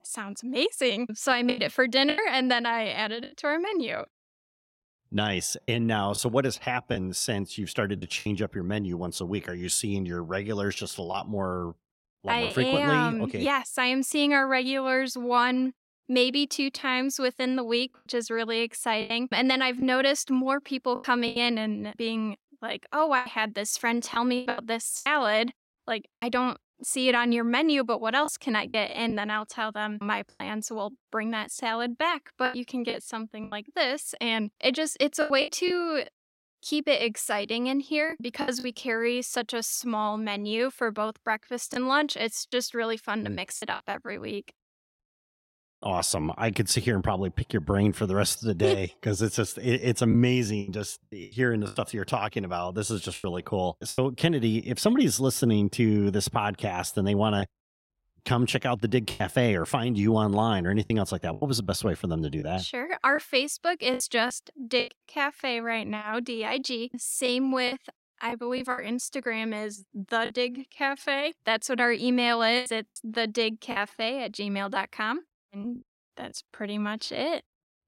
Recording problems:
choppy; occasionally; 5% of the speech affected

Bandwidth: 16 kHz